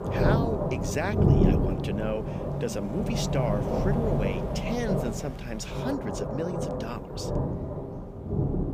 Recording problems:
rain or running water; very loud; throughout; 5 dB above the speech

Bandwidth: 15 kHz